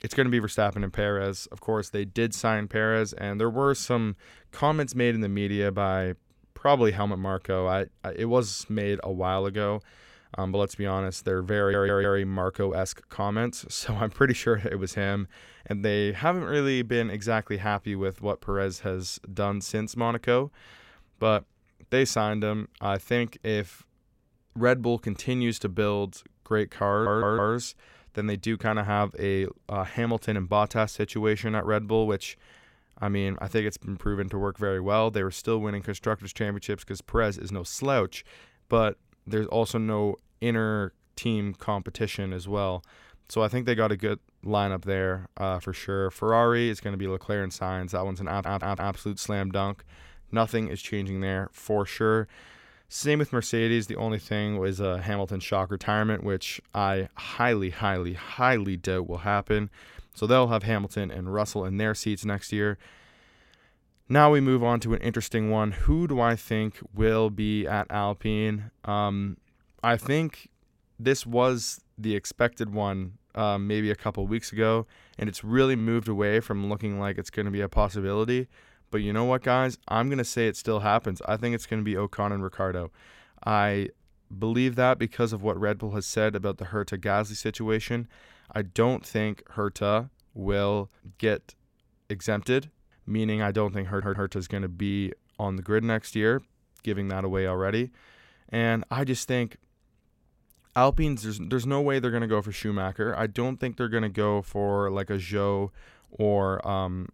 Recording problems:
audio stuttering; 4 times, first at 12 s

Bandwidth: 16.5 kHz